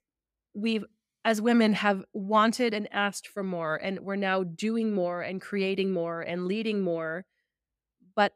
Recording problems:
none

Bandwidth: 15.5 kHz